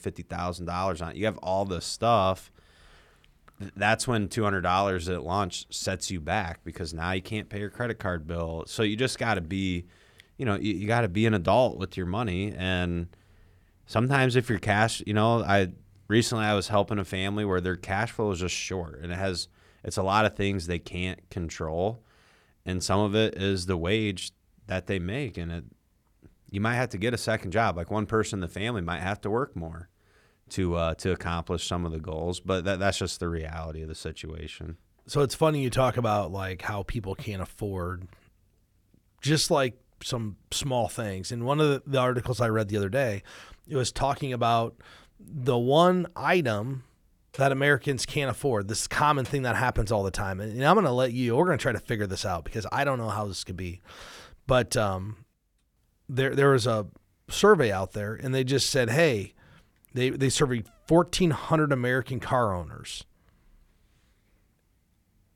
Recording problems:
none

